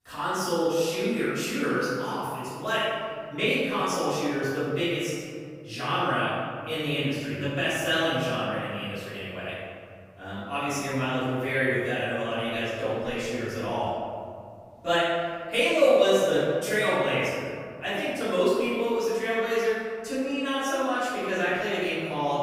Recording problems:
room echo; strong; dies away in 2.3 s
off-mic speech; far

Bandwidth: 15.5 kHz